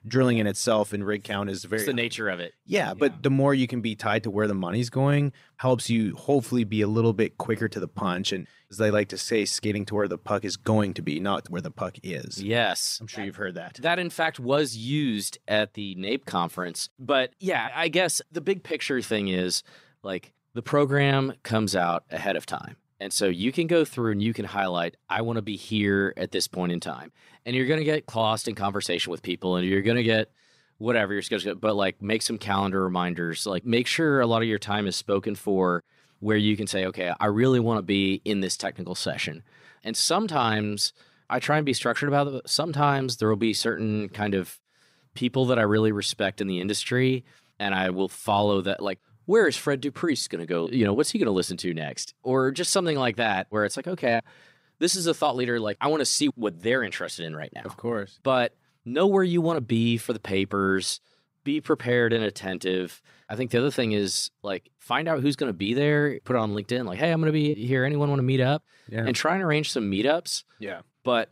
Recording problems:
none

